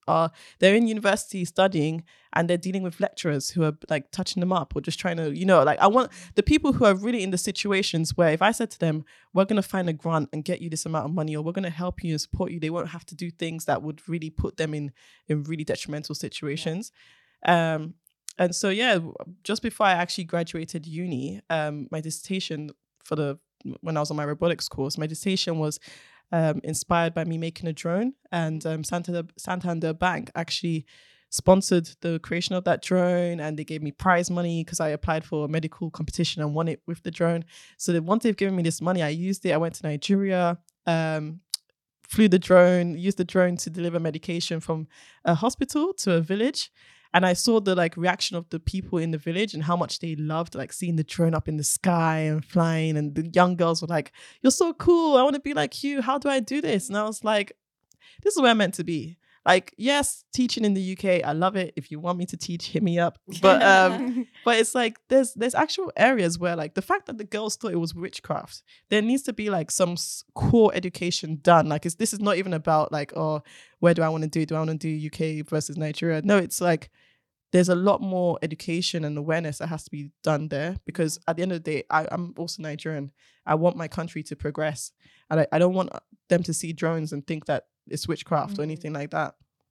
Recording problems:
none

